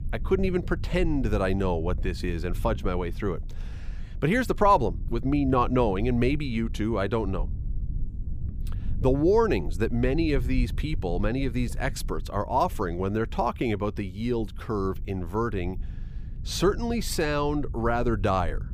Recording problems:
low rumble; faint; throughout; 25 dB below the speech

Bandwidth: 15 kHz